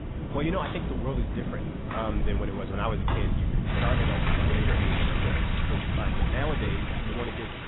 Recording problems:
garbled, watery; badly; nothing above 3.5 kHz
rain or running water; very loud; throughout; as loud as the speech
wind noise on the microphone; heavy; 7 dB below the speech
footsteps; loud; from 0.5 to 5 s; peak 1 dB above the speech

